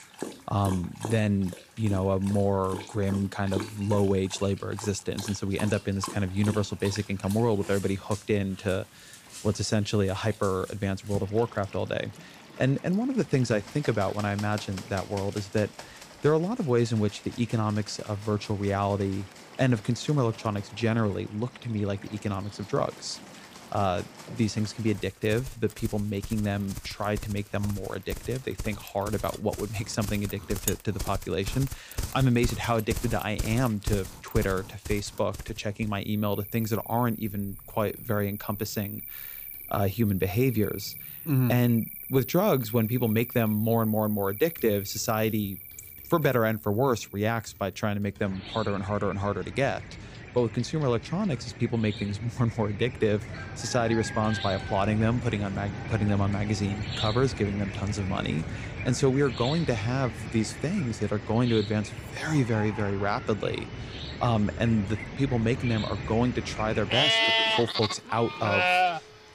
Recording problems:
animal sounds; loud; throughout; 7 dB below the speech
household noises; faint; throughout; 25 dB below the speech

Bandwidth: 15 kHz